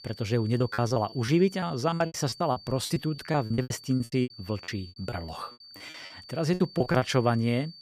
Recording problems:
high-pitched whine; noticeable; throughout; 4.5 kHz, 20 dB below the speech
choppy; very; 17% of the speech affected

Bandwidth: 15 kHz